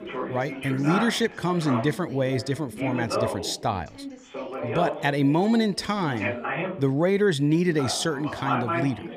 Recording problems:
background chatter; loud; throughout; 3 voices, 6 dB below the speech

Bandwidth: 15 kHz